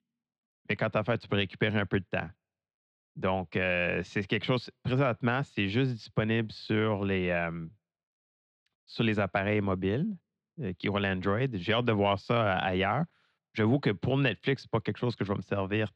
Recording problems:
muffled; slightly; fading above 3.5 kHz

